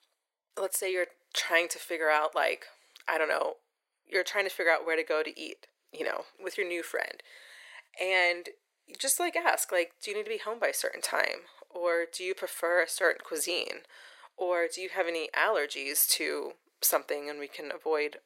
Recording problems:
thin; very; fading below 400 Hz

